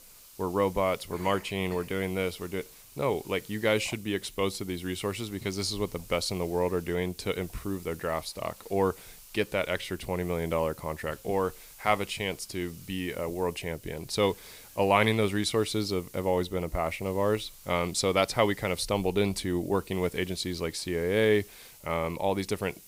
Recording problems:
hiss; noticeable; throughout; 20 dB below the speech

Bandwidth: 15.5 kHz